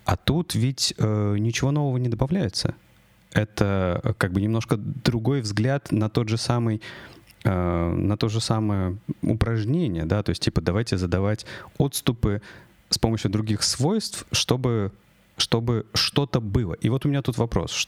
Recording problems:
squashed, flat; somewhat

